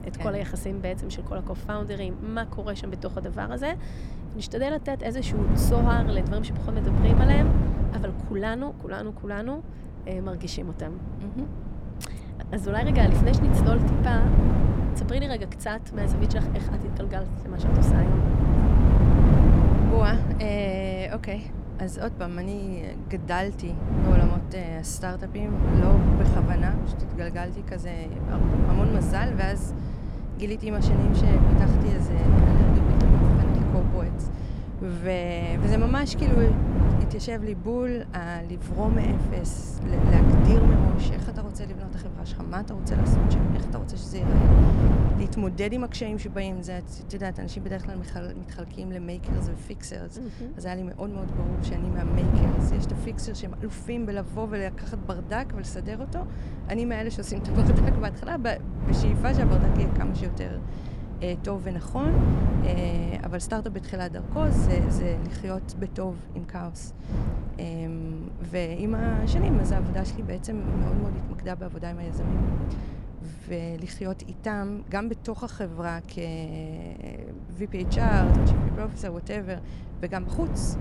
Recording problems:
wind noise on the microphone; heavy; as loud as the speech

